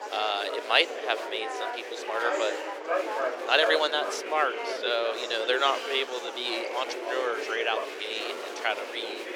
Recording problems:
thin; very; fading below 400 Hz
chatter from many people; loud; throughout; 5 dB below the speech
uneven, jittery; strongly; from 2 to 8.5 s

